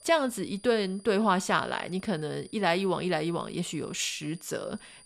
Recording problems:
high-pitched whine; faint; throughout; 9.5 kHz, 25 dB below the speech

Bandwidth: 14 kHz